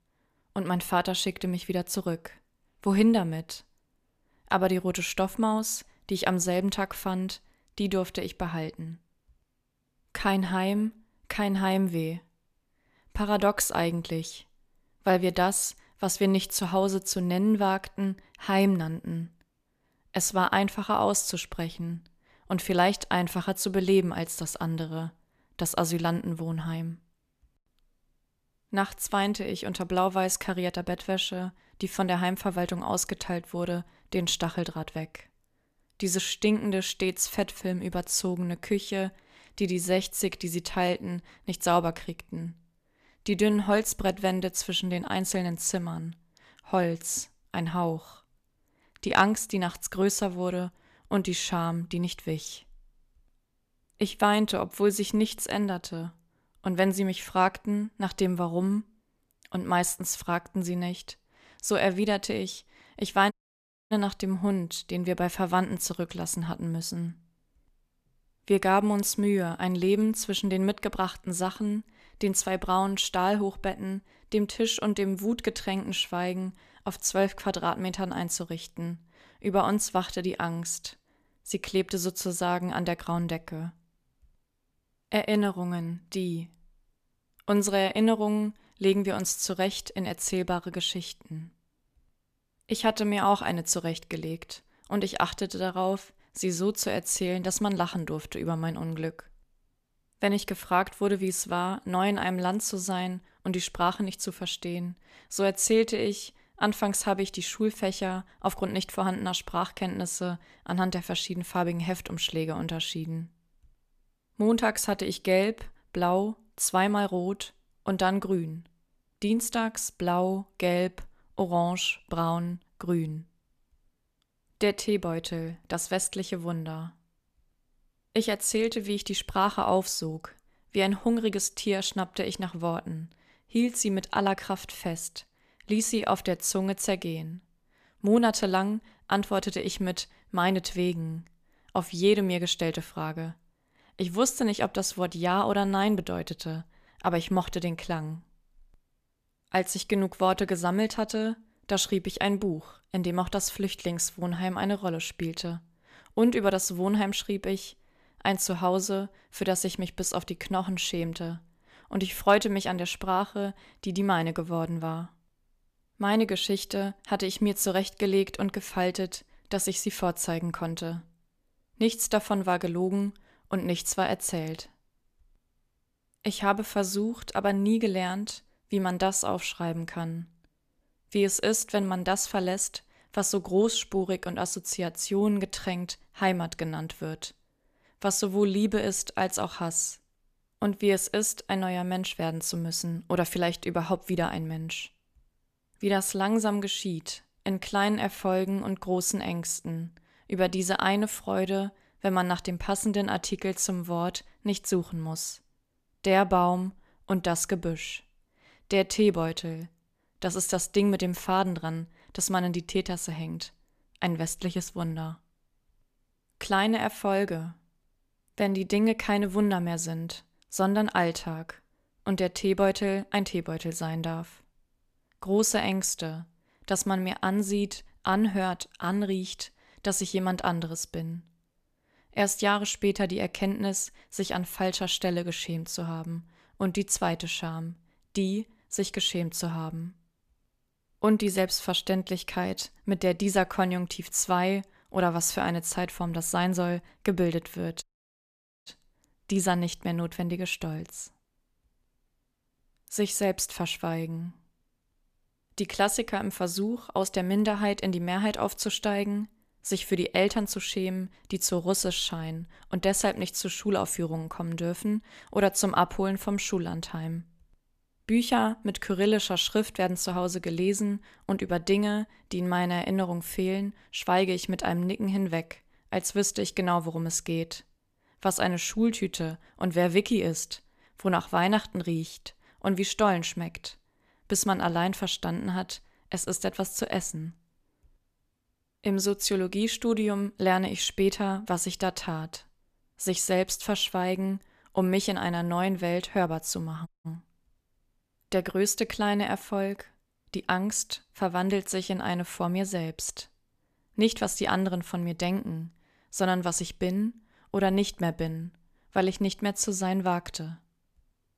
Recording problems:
audio cutting out; at 1:03 for 0.5 s, at 4:08 for 1 s and at 4:57

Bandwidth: 14.5 kHz